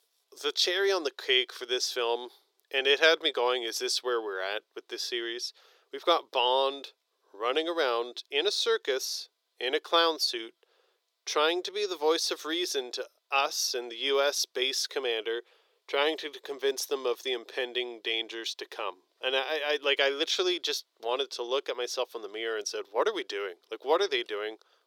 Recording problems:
thin; very; fading below 400 Hz

